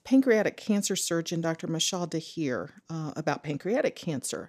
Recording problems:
none

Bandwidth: 14.5 kHz